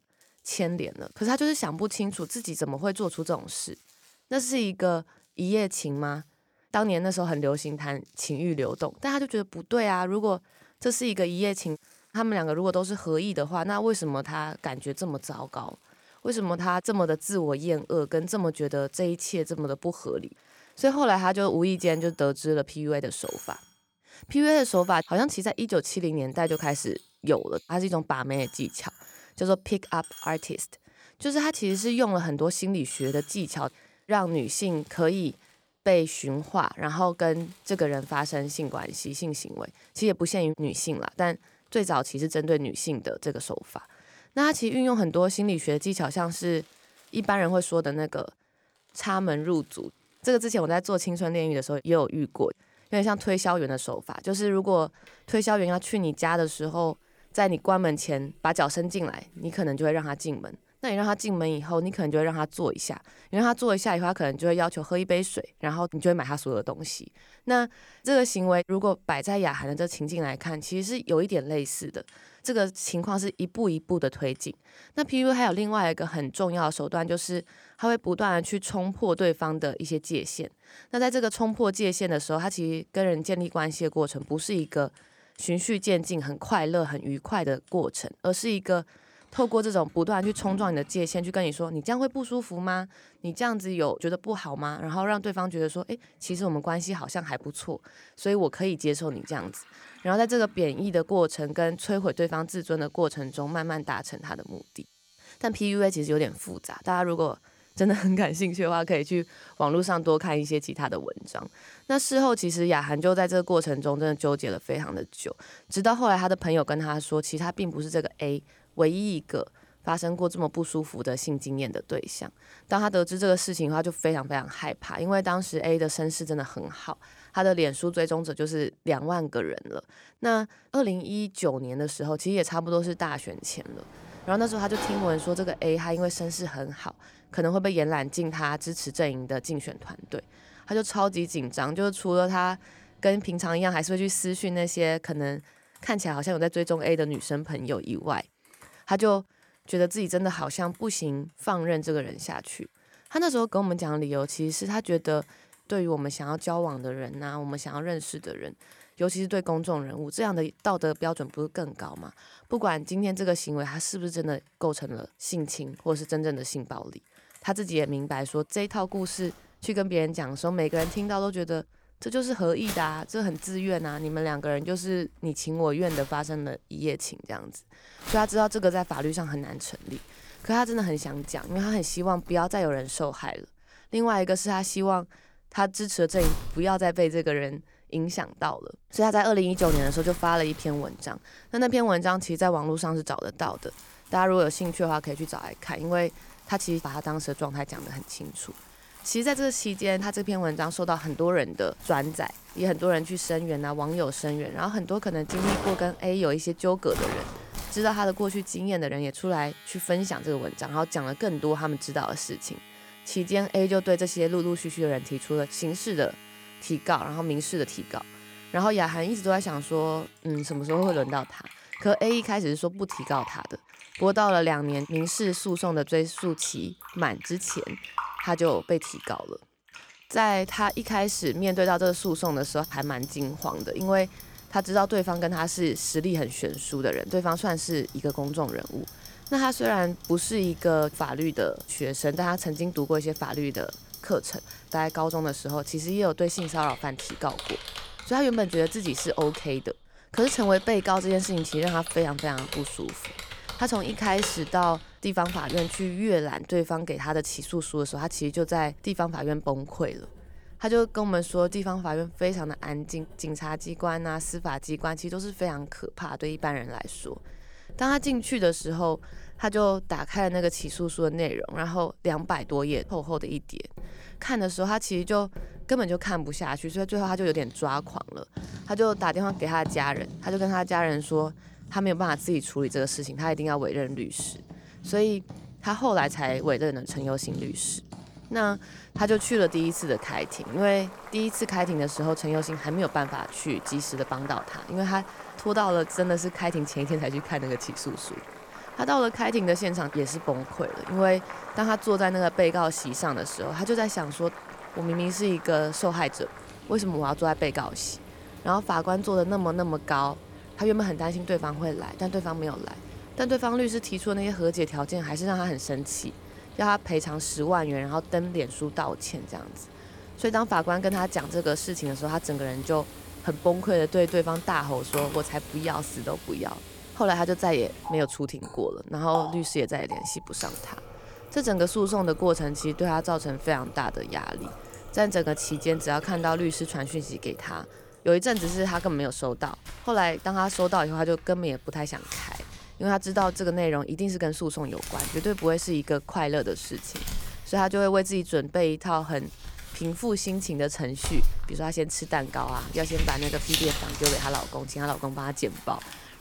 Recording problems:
household noises; noticeable; throughout; 15 dB below the speech

